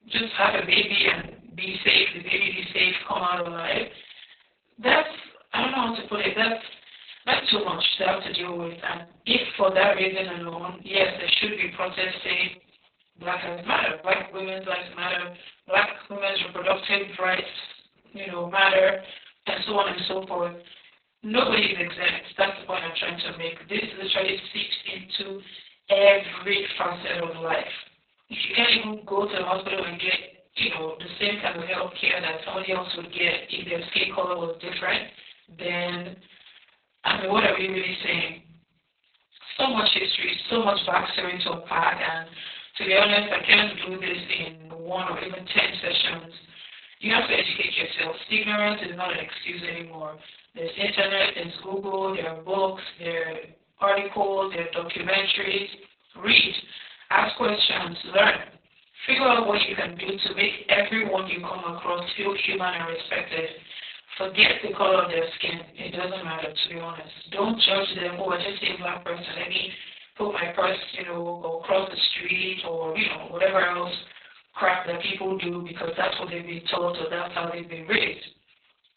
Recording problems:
off-mic speech; far
garbled, watery; badly; nothing above 4 kHz
thin; somewhat; fading below 450 Hz
room echo; slight; dies away in 0.4 s

